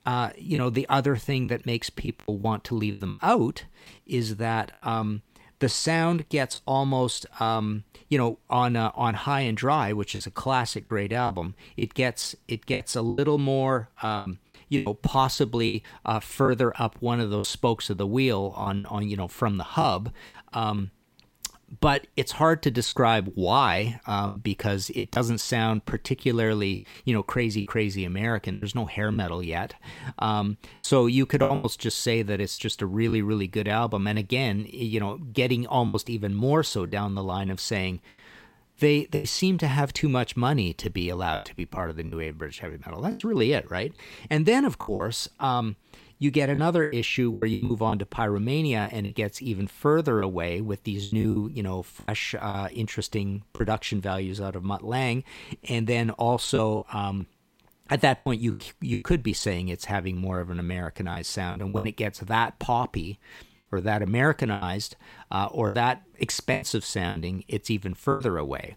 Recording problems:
choppy; very; 6% of the speech affected

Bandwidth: 16 kHz